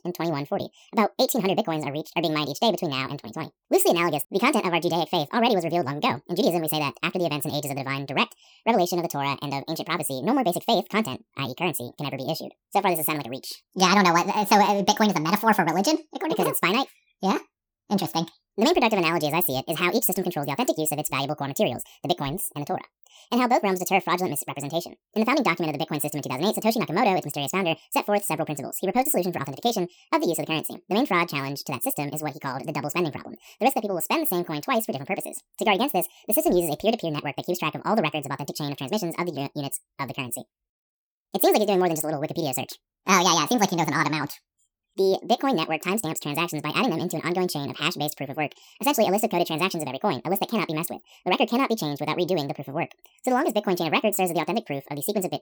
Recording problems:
wrong speed and pitch; too fast and too high; 1.7 times normal speed

